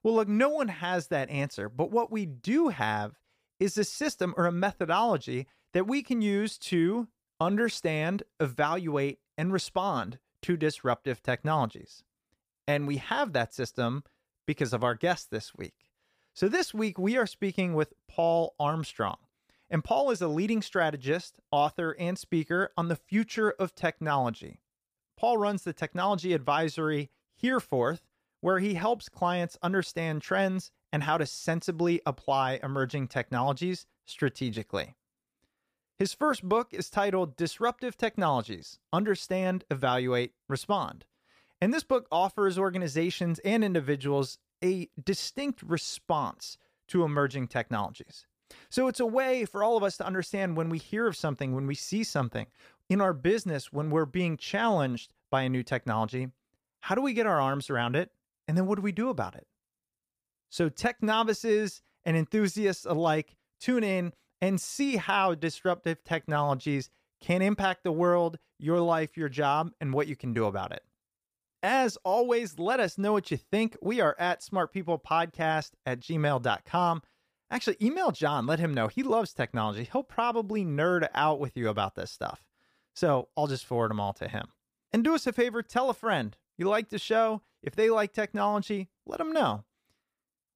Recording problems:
none

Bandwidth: 15 kHz